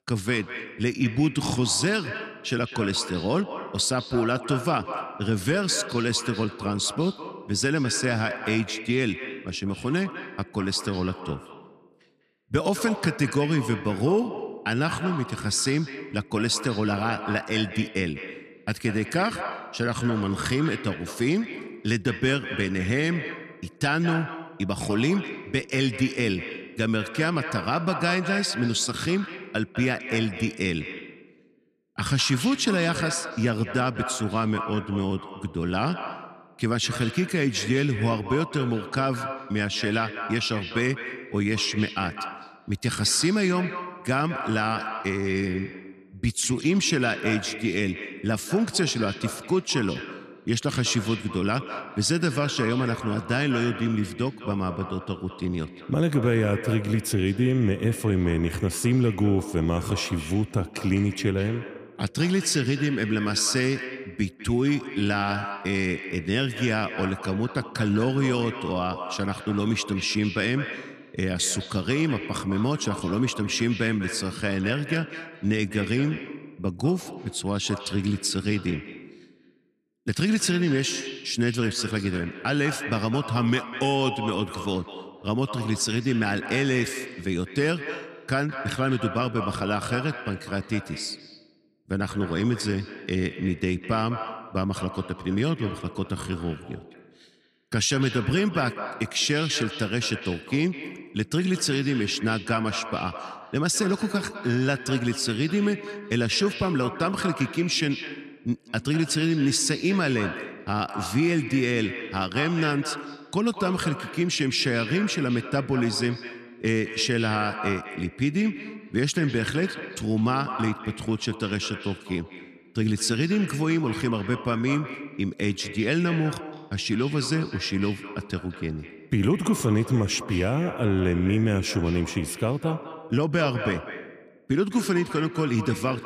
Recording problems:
echo of what is said; strong; throughout; 200 ms later, 10 dB below the speech

